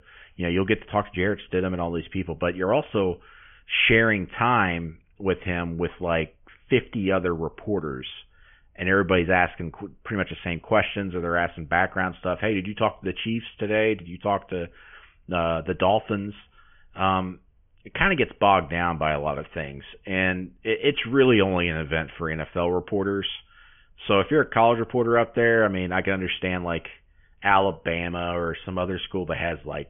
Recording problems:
high frequencies cut off; severe; nothing above 3 kHz

